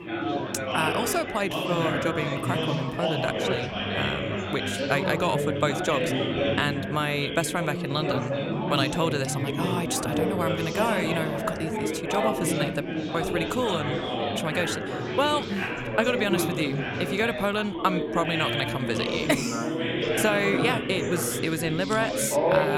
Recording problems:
chatter from many people; loud; throughout; as loud as the speech
abrupt cut into speech; at the end

